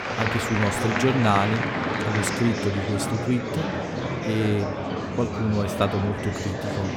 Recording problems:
murmuring crowd; loud; throughout; 1 dB below the speech

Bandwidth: 17 kHz